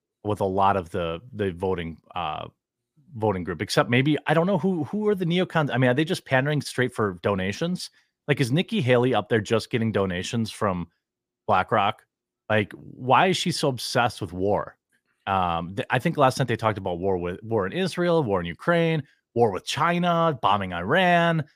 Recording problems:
none

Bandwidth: 15 kHz